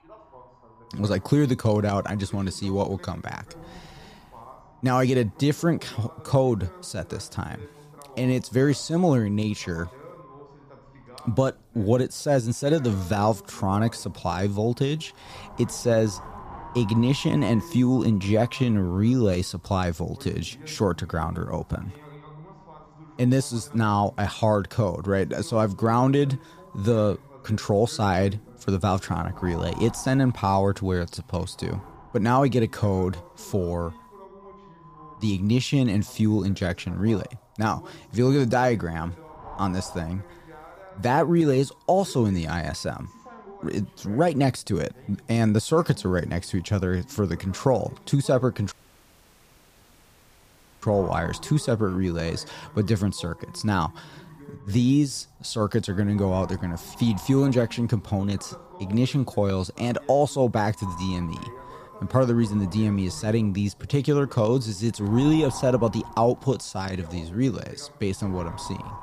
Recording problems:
wind noise on the microphone; occasional gusts; 15 dB below the speech
voice in the background; faint; throughout; 25 dB below the speech
audio cutting out; at 49 s for 2 s

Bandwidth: 15 kHz